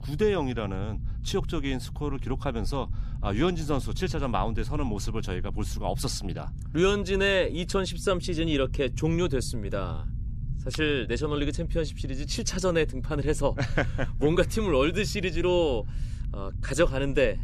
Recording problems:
low rumble; faint; throughout; 20 dB below the speech

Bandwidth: 14.5 kHz